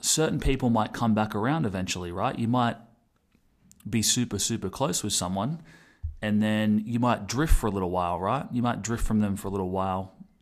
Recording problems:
none

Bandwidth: 14.5 kHz